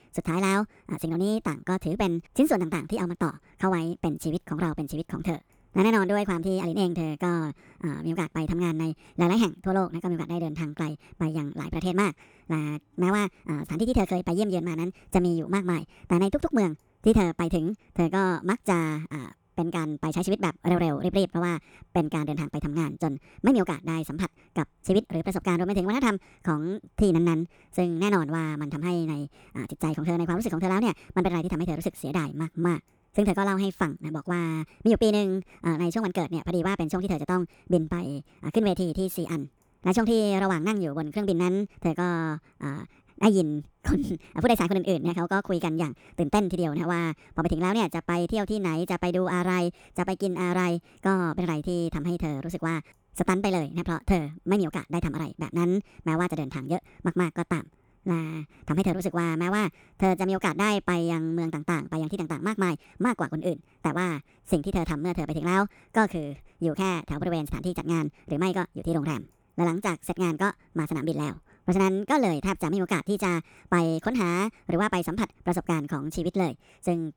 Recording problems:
wrong speed and pitch; too fast and too high; 1.5 times normal speed

